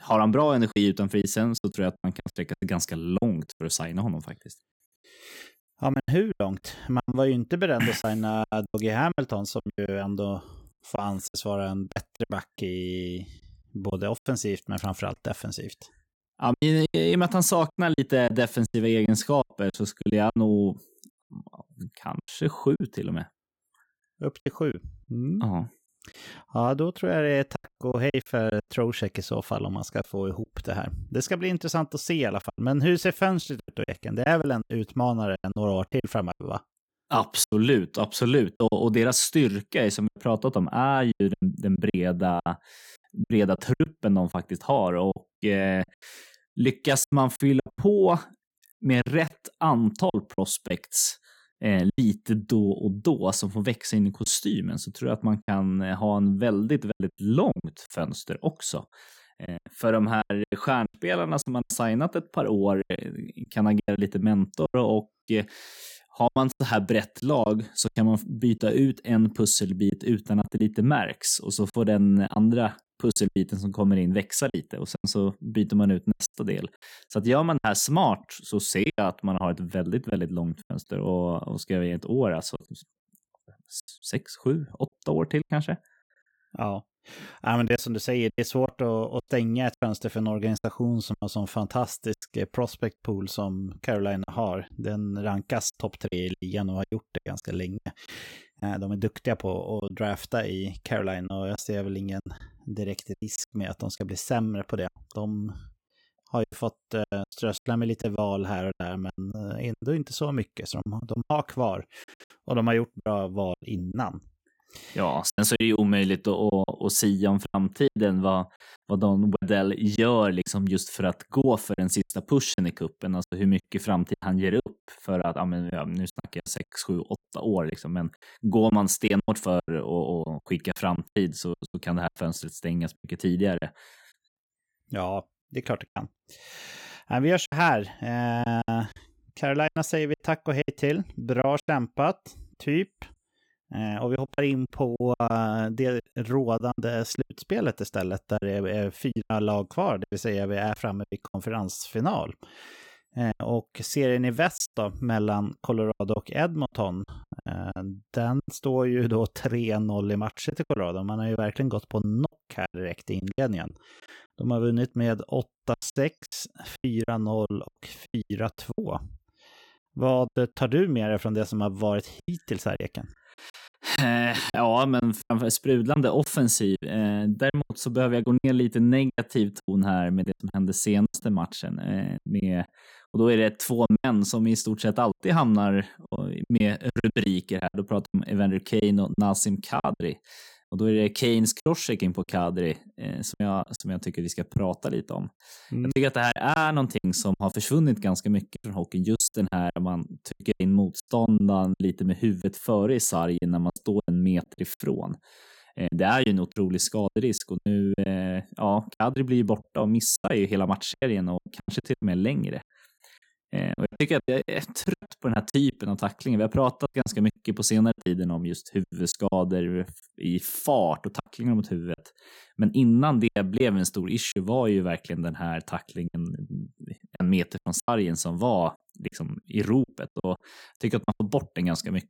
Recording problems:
choppy; very; 10% of the speech affected

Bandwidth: 17.5 kHz